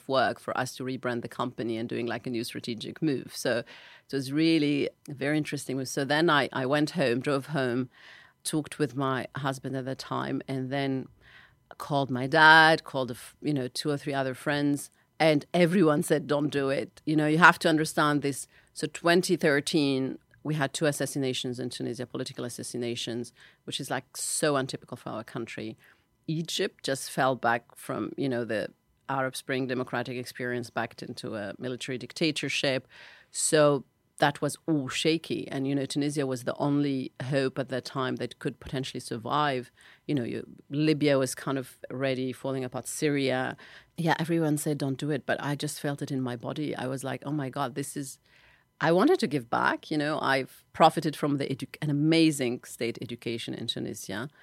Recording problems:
none

